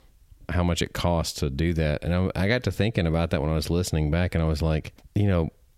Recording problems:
squashed, flat; somewhat

